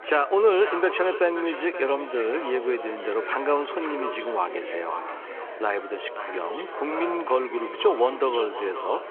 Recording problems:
echo of what is said; strong; throughout; 530 ms later, 10 dB below the speech
phone-call audio
chatter from many people; noticeable; throughout; 10 dB below the speech

